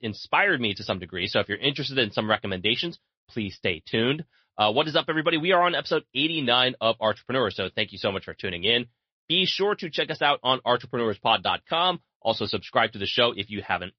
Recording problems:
high frequencies cut off; noticeable; nothing above 5.5 kHz
garbled, watery; slightly

